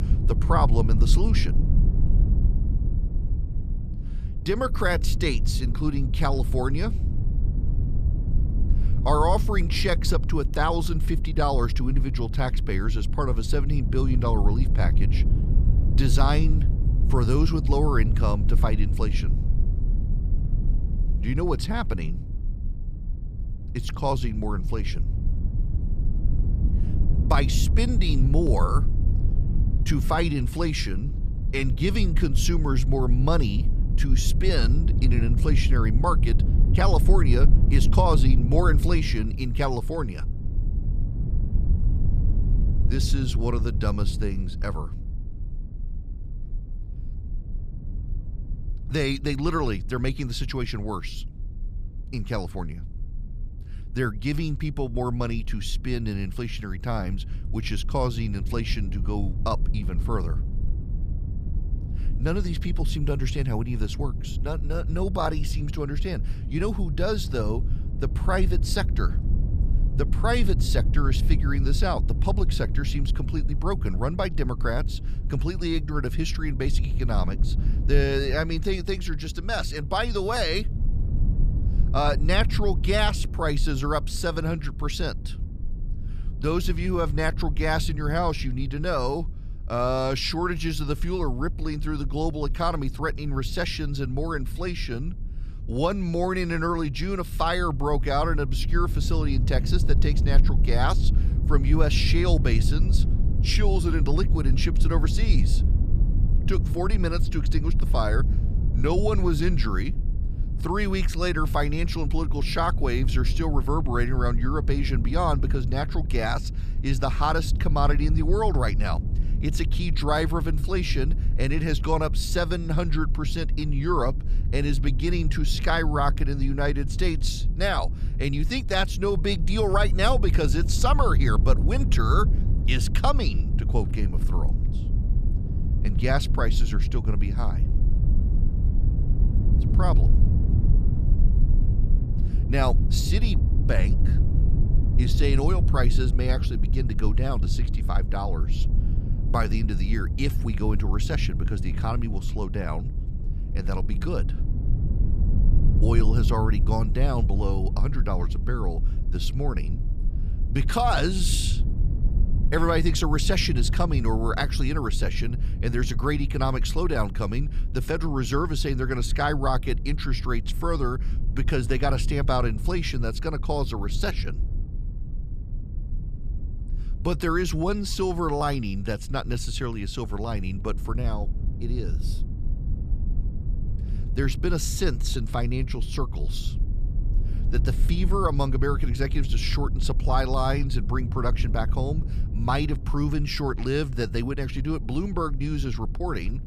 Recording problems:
low rumble; noticeable; throughout; 15 dB below the speech

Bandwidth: 14.5 kHz